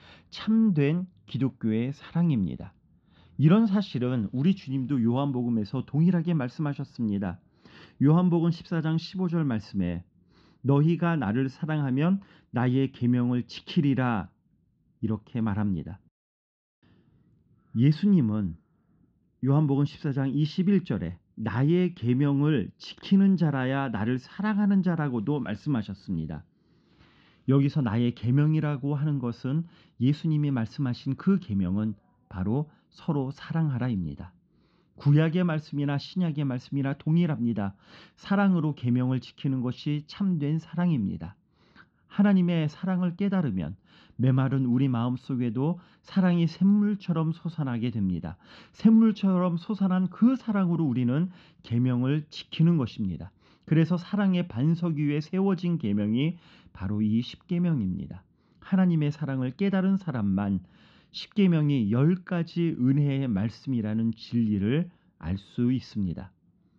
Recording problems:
muffled; slightly; fading above 3.5 kHz

